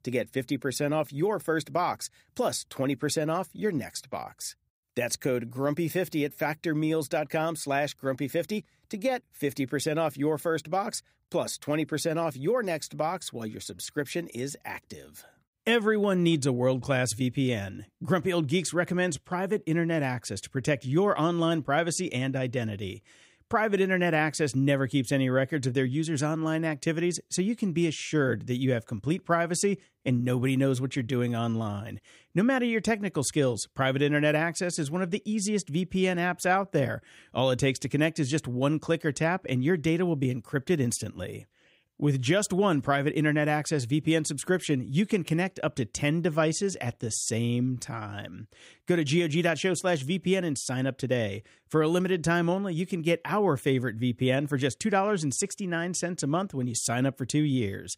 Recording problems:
none

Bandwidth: 15.5 kHz